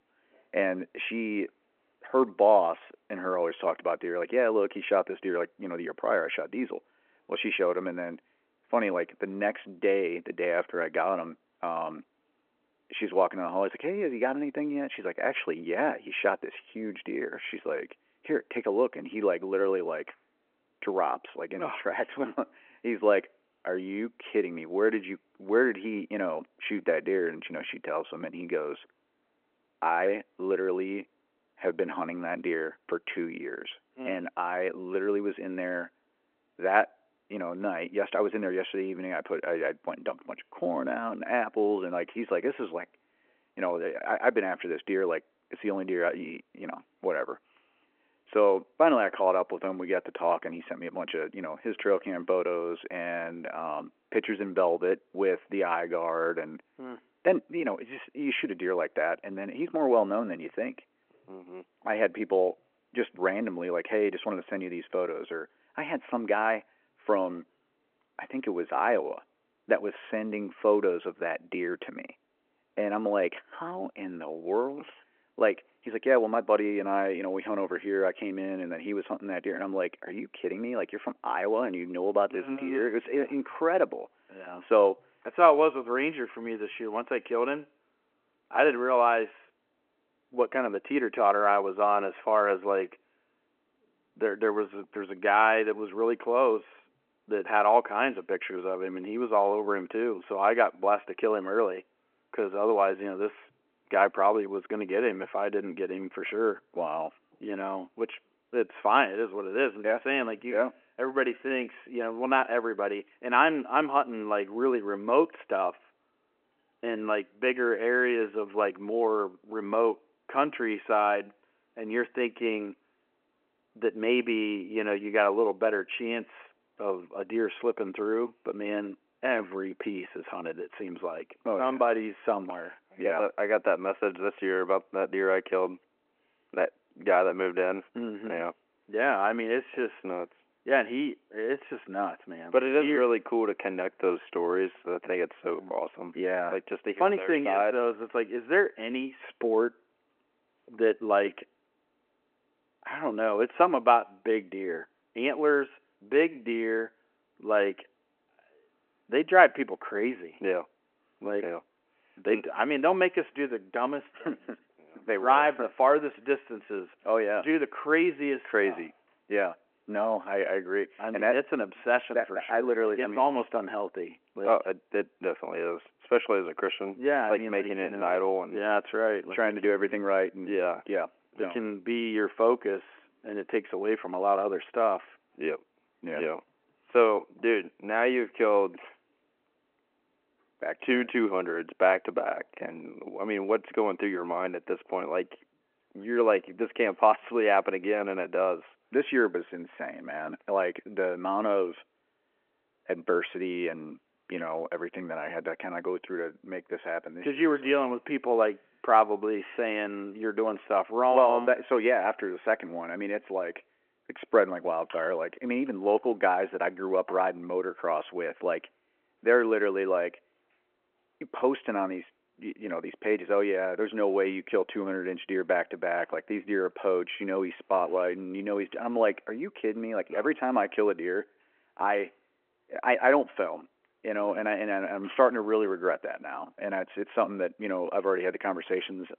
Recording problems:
phone-call audio

